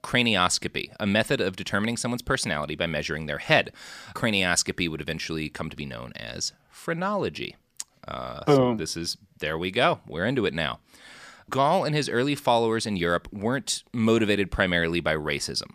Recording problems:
none

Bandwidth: 15 kHz